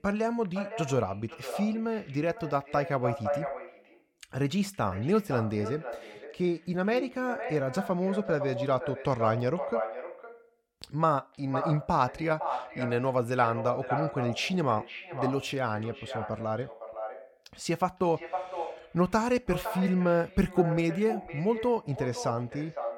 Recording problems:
echo of what is said; strong; throughout; 510 ms later, 8 dB below the speech

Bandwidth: 17 kHz